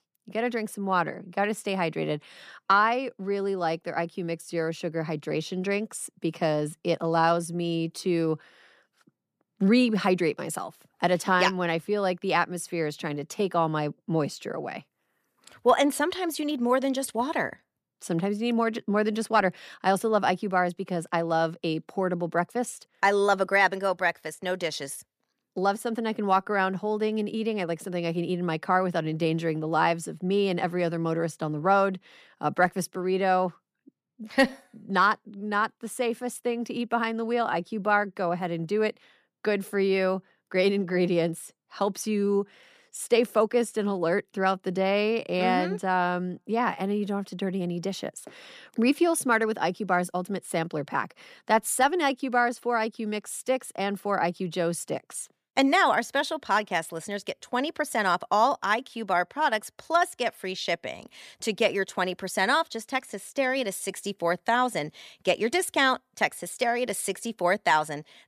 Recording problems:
none

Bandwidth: 14.5 kHz